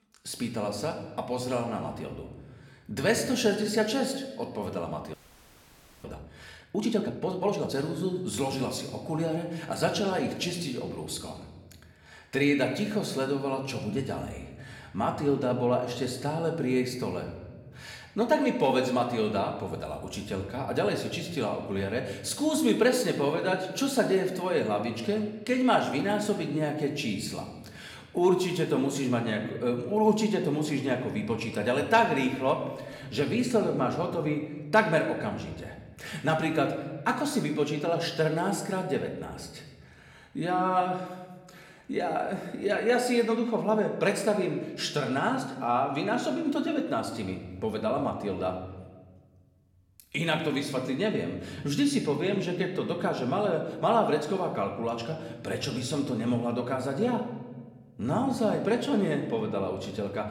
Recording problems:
room echo; slight; dies away in 1.1 s
off-mic speech; somewhat distant
audio freezing; at 5 s for 1 s

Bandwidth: 17 kHz